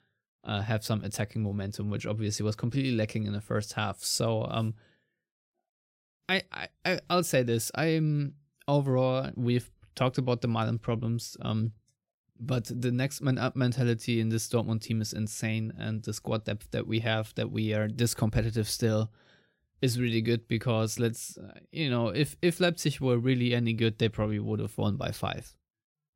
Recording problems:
none

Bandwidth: 16 kHz